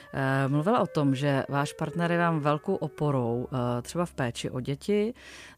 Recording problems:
background music; noticeable; throughout; 20 dB below the speech

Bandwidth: 15 kHz